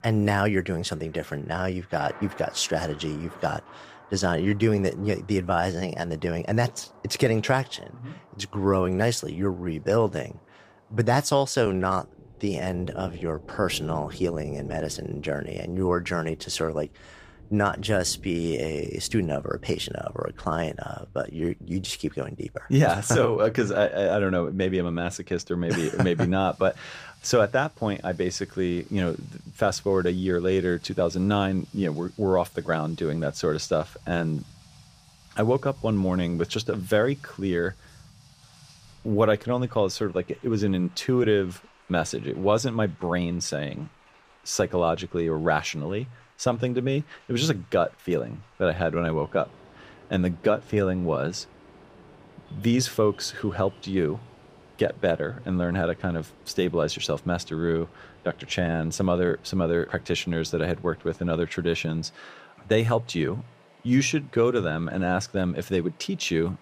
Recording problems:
rain or running water; faint; throughout; 25 dB below the speech

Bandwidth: 15 kHz